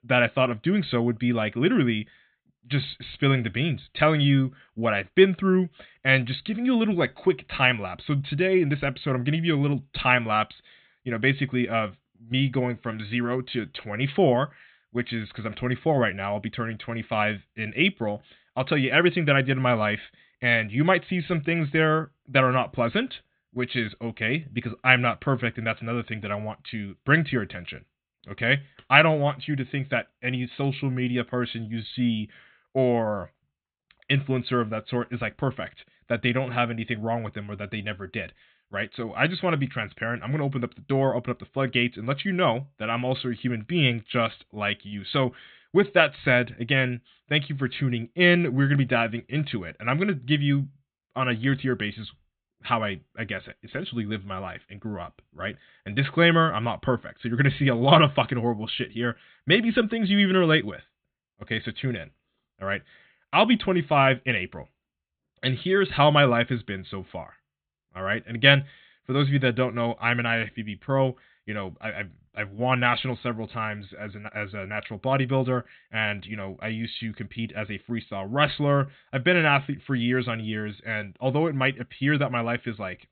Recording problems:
high frequencies cut off; severe; nothing above 4 kHz

